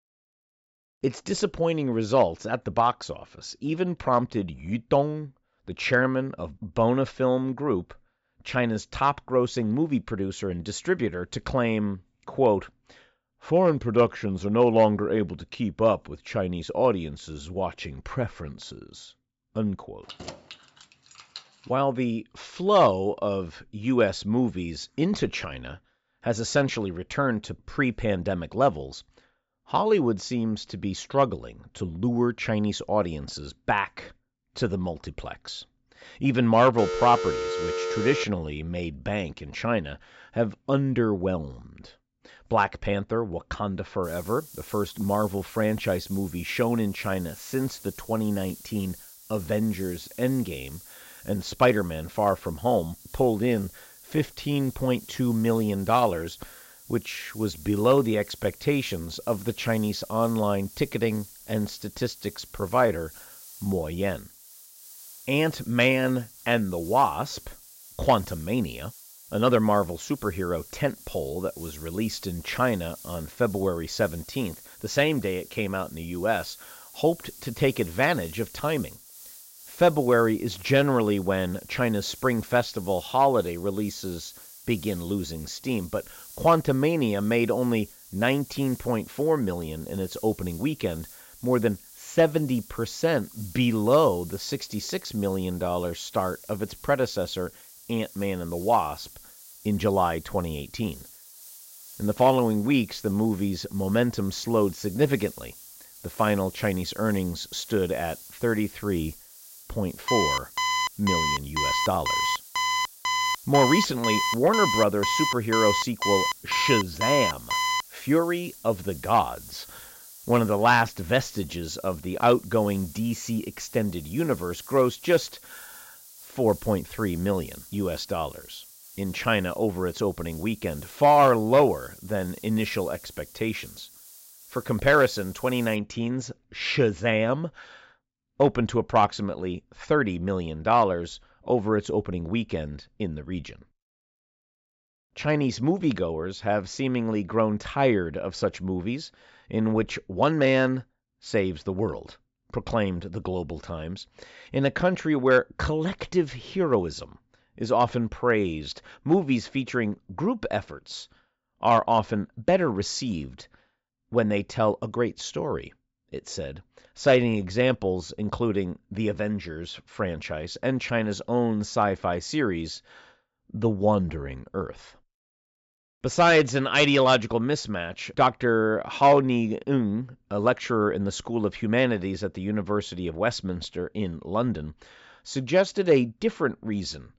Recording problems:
high frequencies cut off; noticeable; nothing above 8 kHz
hiss; noticeable; from 44 s to 2:16; 20 dB below the speech
jangling keys; faint; from 20 to 22 s; peak 15 dB below the speech
phone ringing; noticeable; from 37 to 38 s; peak 3 dB below the speech
alarm; loud; from 1:50 to 1:58; peak 1 dB above the speech

